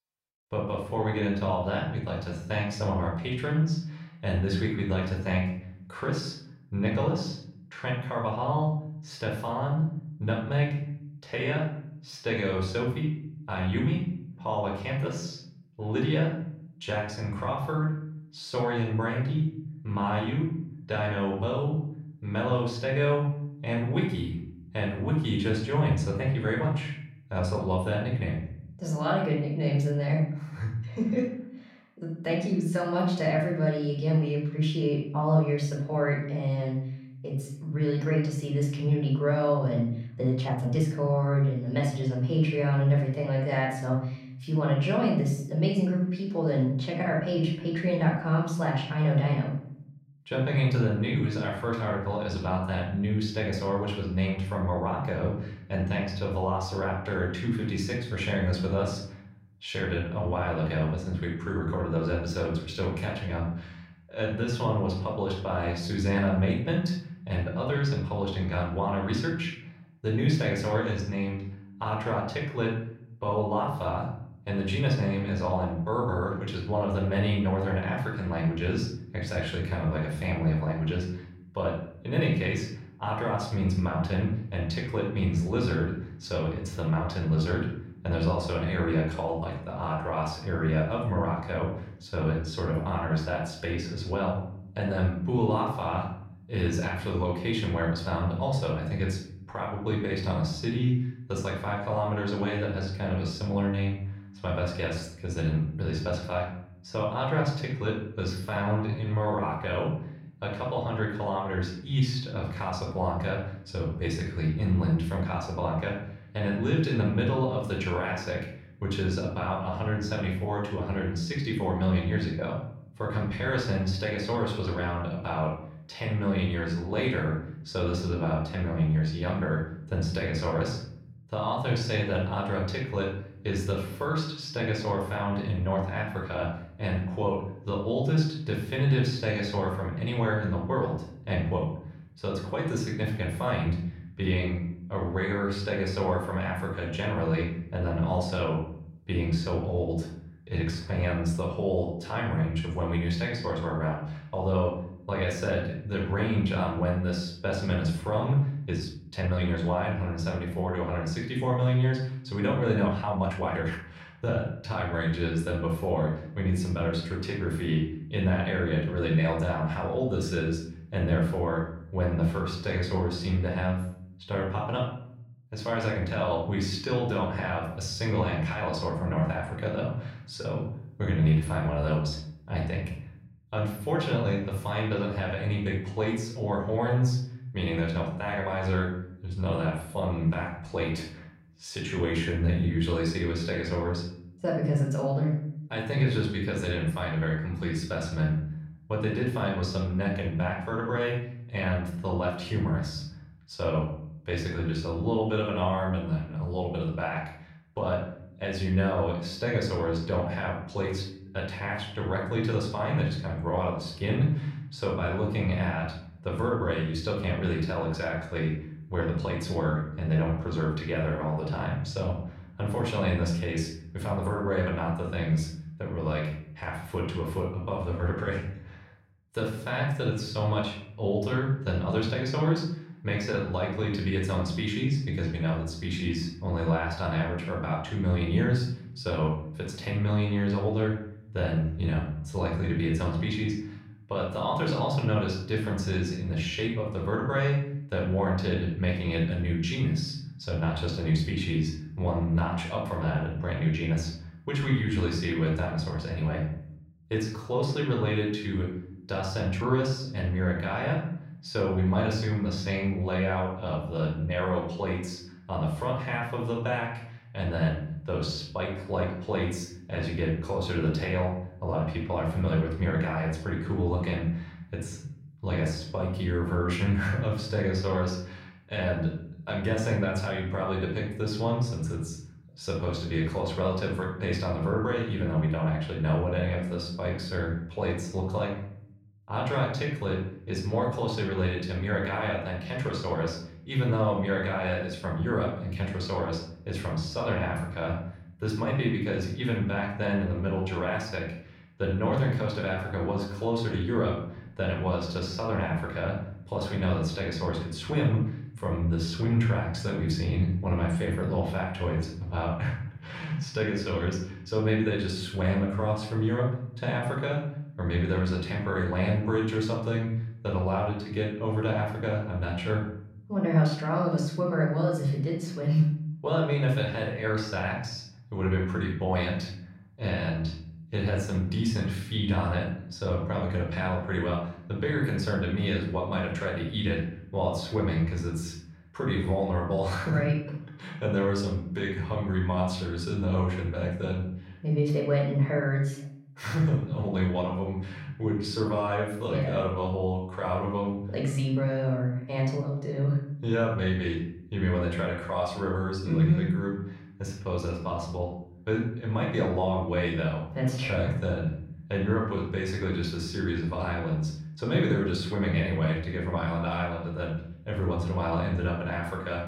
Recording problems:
off-mic speech; far
room echo; noticeable; dies away in 0.7 s
uneven, jittery; strongly; from 40 s to 5:13

